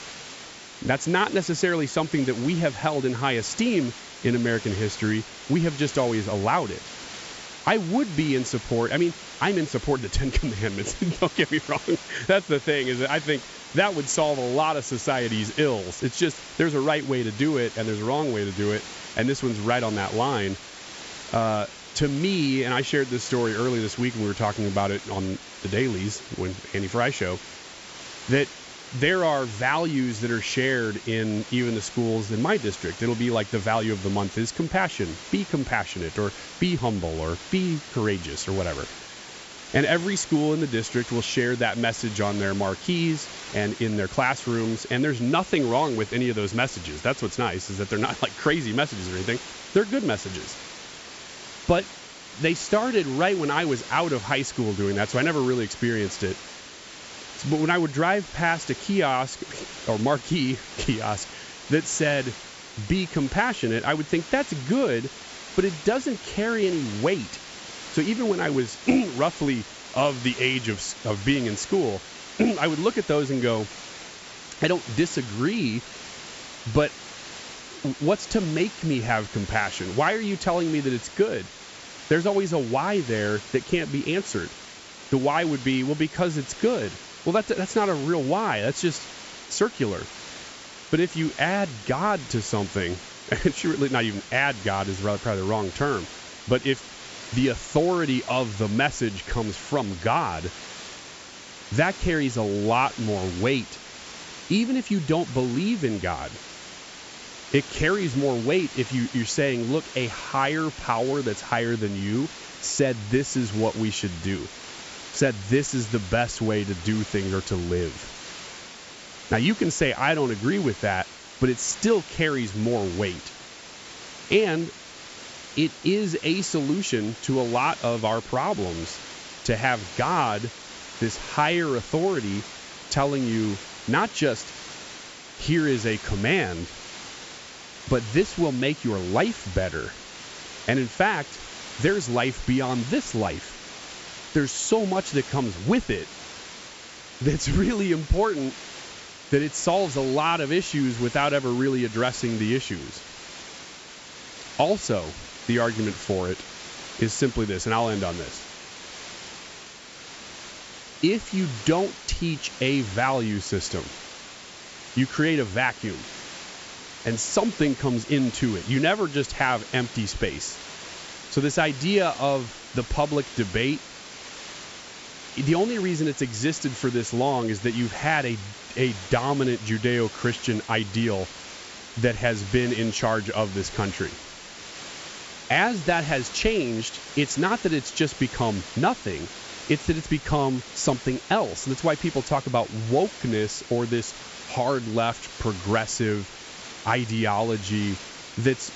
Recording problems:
high frequencies cut off; noticeable; nothing above 8 kHz
hiss; noticeable; throughout; 15 dB below the speech

